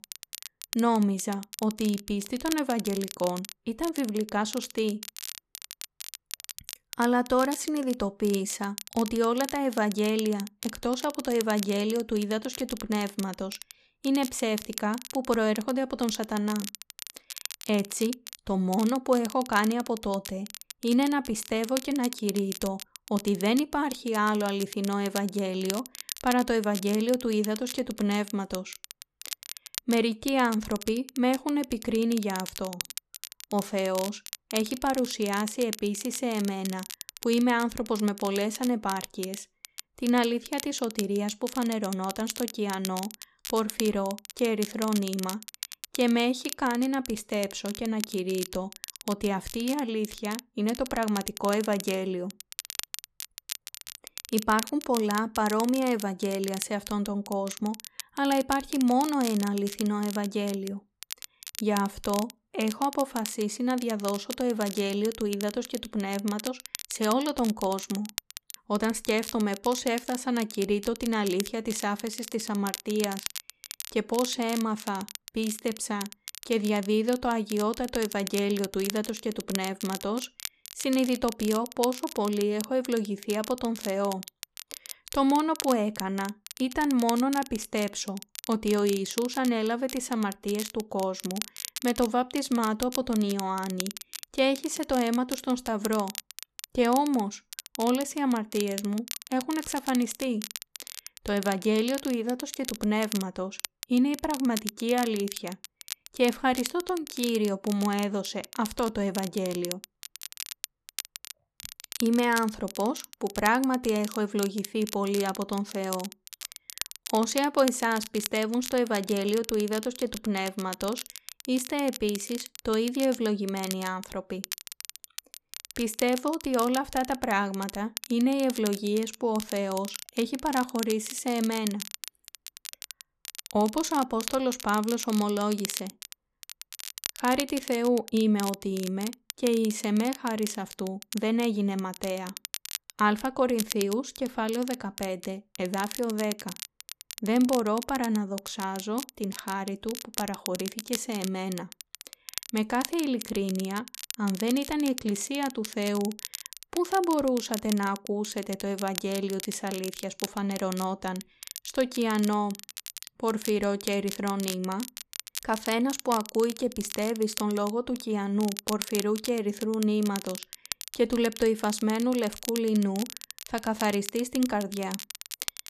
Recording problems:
crackle, like an old record; noticeable; 10 dB below the speech

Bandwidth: 14 kHz